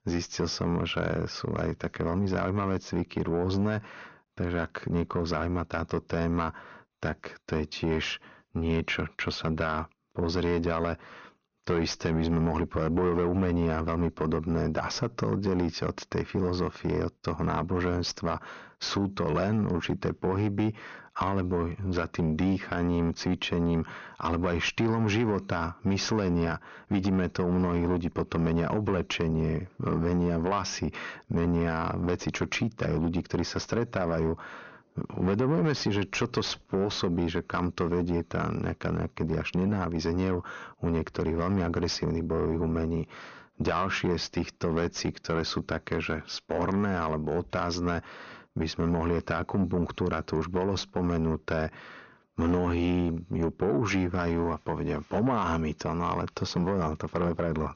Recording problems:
high frequencies cut off; noticeable; nothing above 6.5 kHz
distortion; slight; 10 dB below the speech

